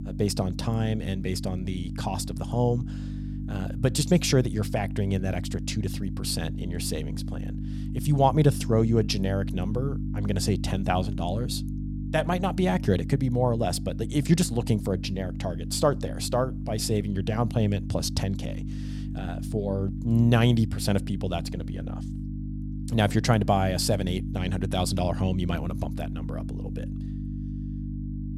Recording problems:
electrical hum; noticeable; throughout; 50 Hz, 15 dB below the speech

